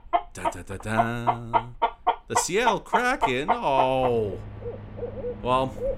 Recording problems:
animal sounds; loud; throughout; 2 dB below the speech

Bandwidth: 16 kHz